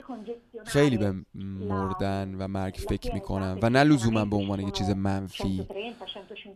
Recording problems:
voice in the background; noticeable; throughout; 10 dB below the speech

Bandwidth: 14 kHz